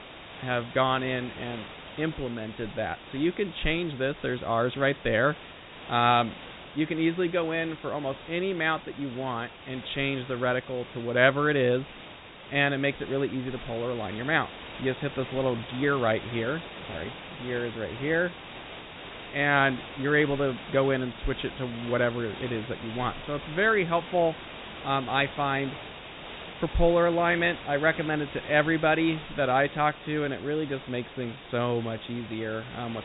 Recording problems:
high frequencies cut off; severe; nothing above 4 kHz
hiss; noticeable; throughout; 15 dB below the speech

